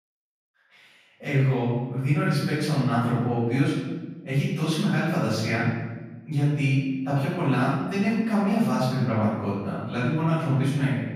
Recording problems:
room echo; strong; dies away in 1.1 s
off-mic speech; far

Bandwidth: 15 kHz